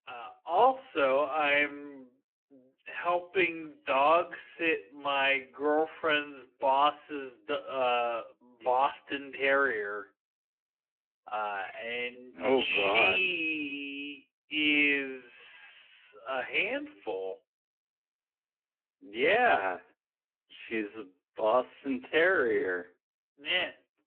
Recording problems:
wrong speed, natural pitch; too slow; 0.6 times normal speed
phone-call audio

